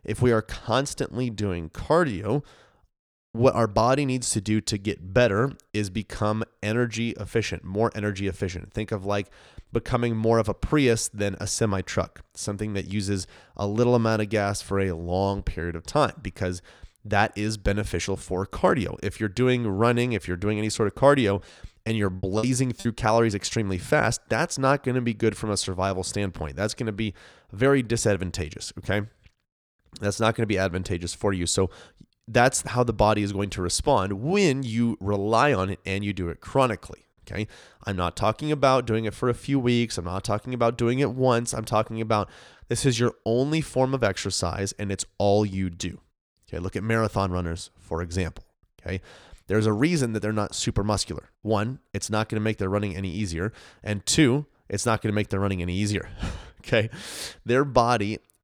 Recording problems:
choppy; very; from 21 to 23 s; 16% of the speech affected

